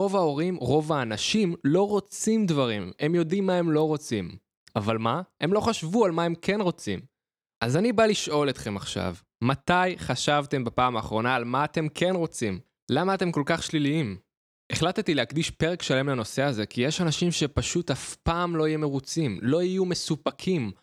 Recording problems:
abrupt cut into speech; at the start

